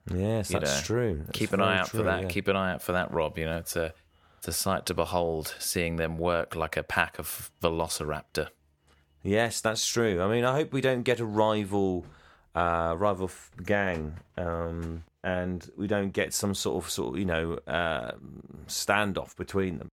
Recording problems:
none

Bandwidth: 18.5 kHz